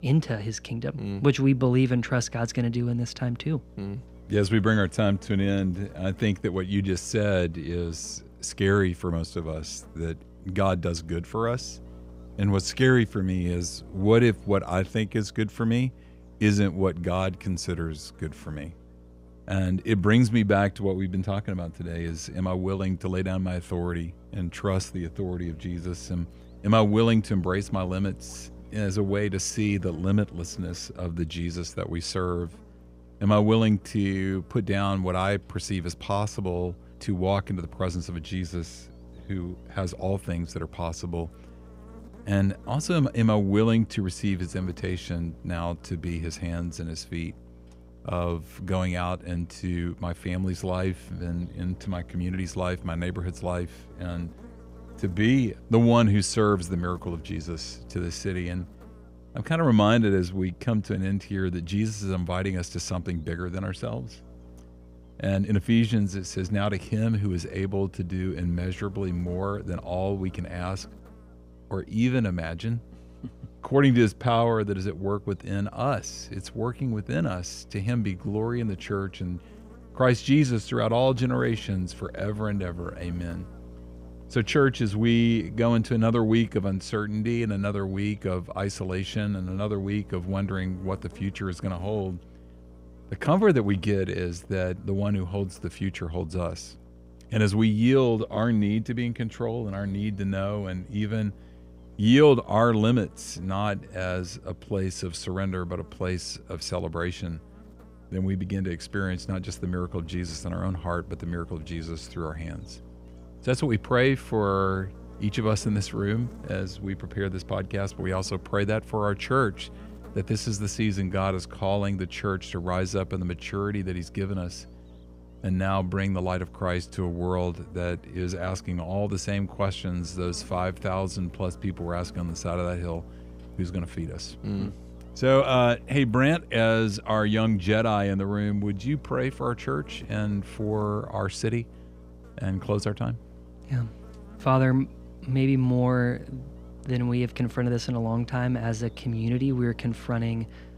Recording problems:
electrical hum; faint; throughout; 60 Hz, 25 dB below the speech

